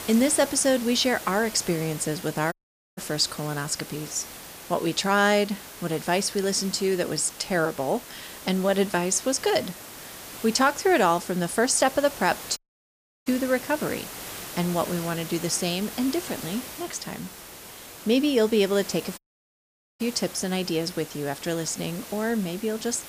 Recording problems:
hiss; noticeable; throughout; 15 dB below the speech
audio cutting out; at 2.5 s, at 13 s for 0.5 s and at 19 s for 1 s

